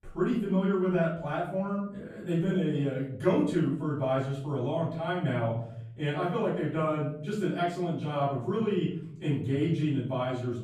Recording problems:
off-mic speech; far
room echo; noticeable; dies away in 0.8 s

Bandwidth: 15 kHz